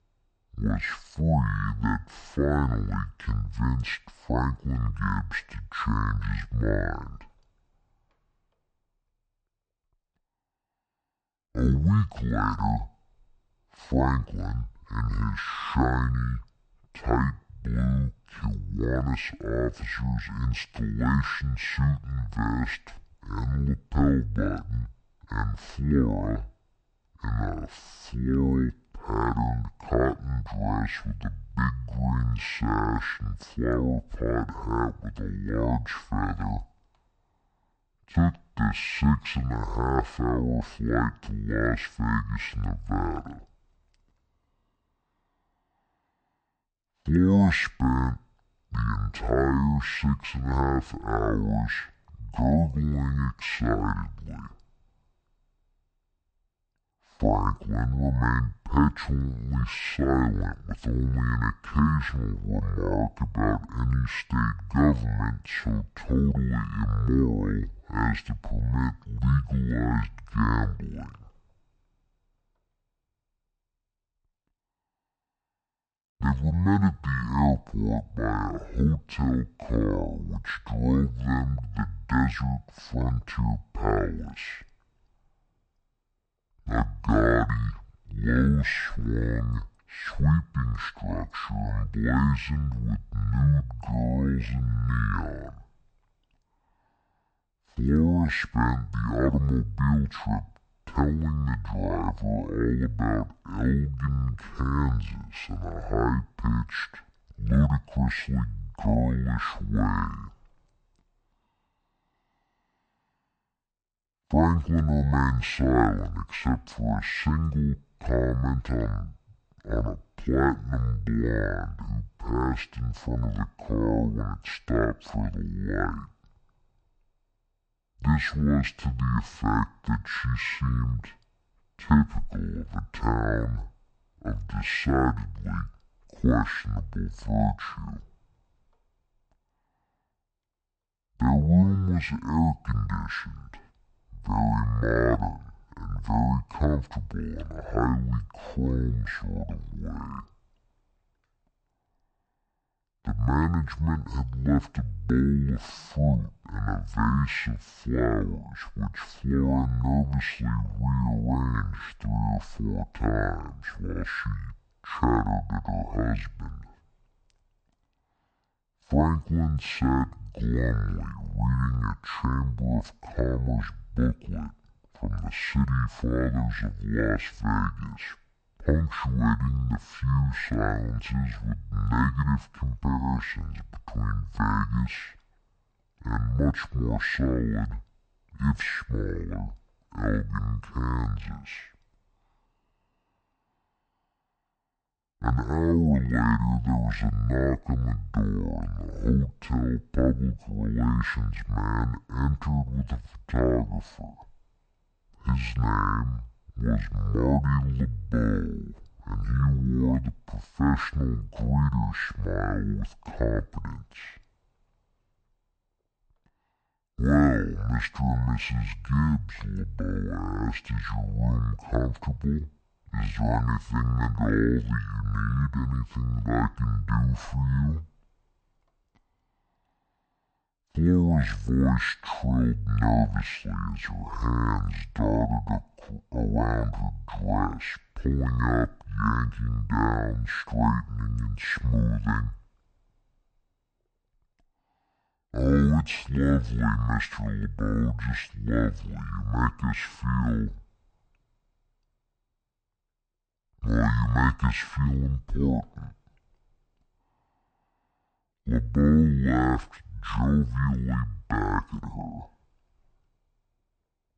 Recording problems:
wrong speed and pitch; too slow and too low; 0.5 times normal speed

